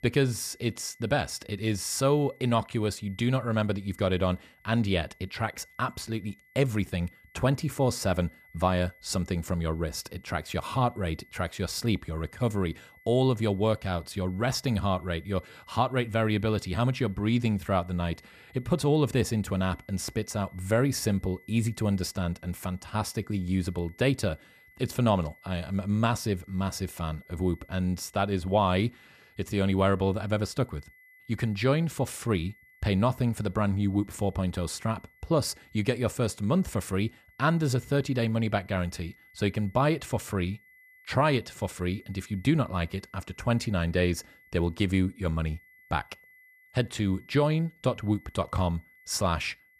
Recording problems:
high-pitched whine; faint; throughout; 2 kHz, 30 dB below the speech

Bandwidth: 14.5 kHz